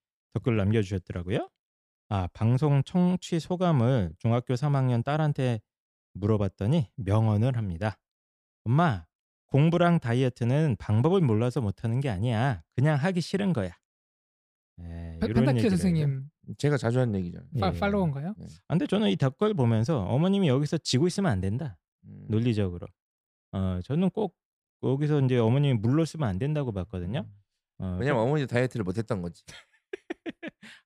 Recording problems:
none

